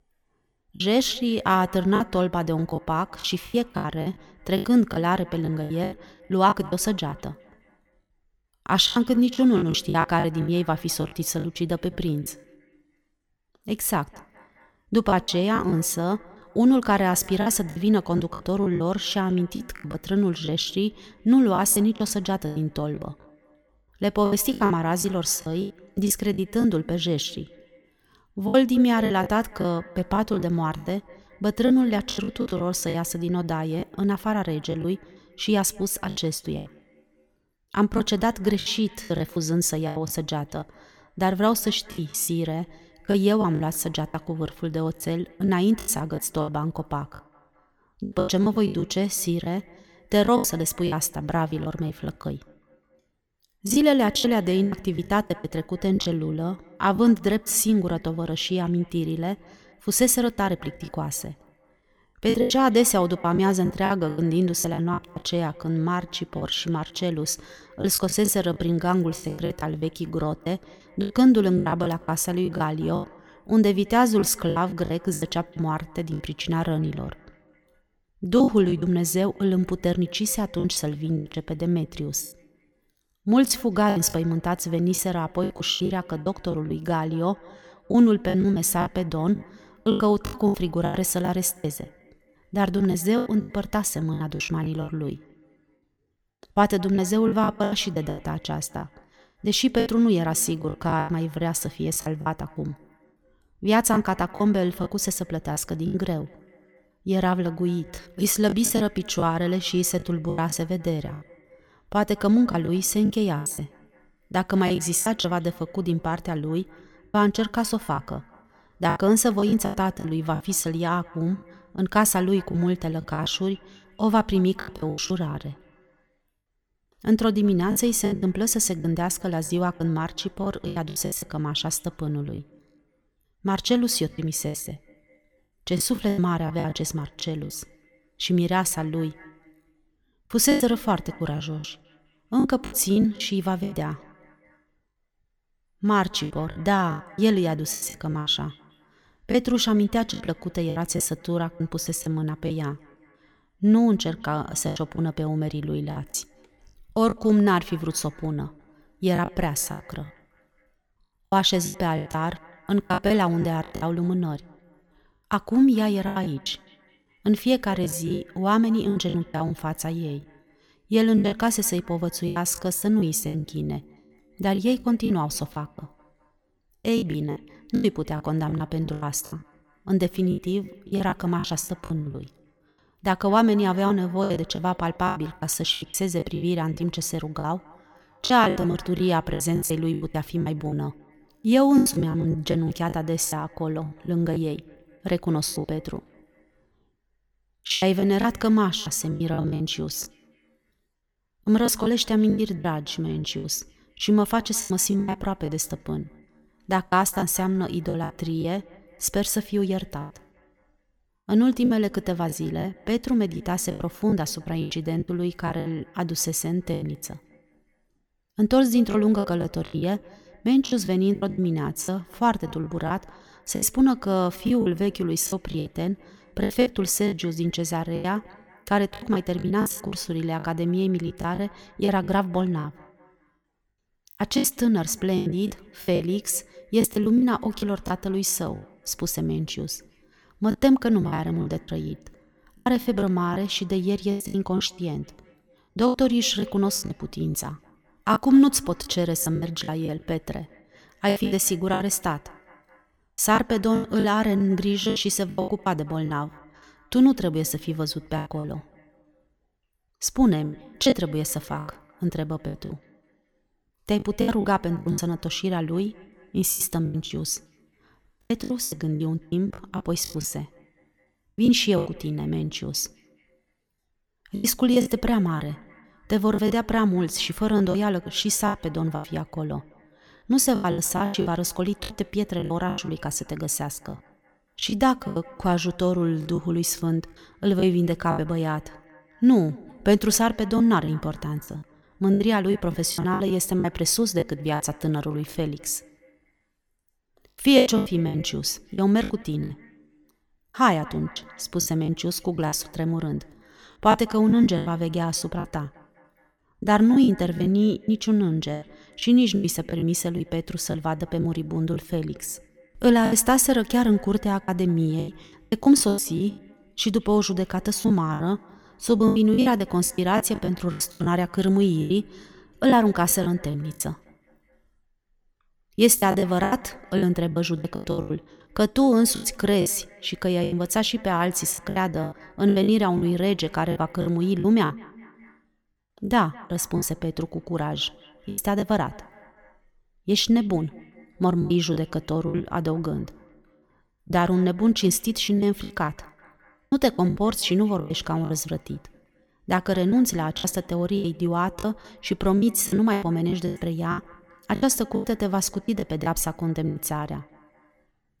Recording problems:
echo of what is said; faint; throughout; 210 ms later, 25 dB below the speech
choppy; very; 12% of the speech affected

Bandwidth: 18 kHz